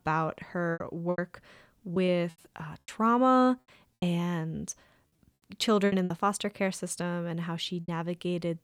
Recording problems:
choppy; very; 8% of the speech affected

